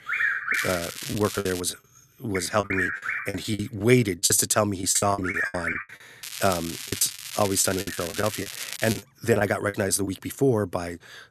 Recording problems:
animal sounds; loud; throughout; 4 dB below the speech
crackling; loud; from 0.5 to 1.5 s and from 6 to 9 s; 9 dB below the speech
choppy; very; at 1 s, from 2.5 to 6 s and from 7 to 10 s; 17% of the speech affected

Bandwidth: 13.5 kHz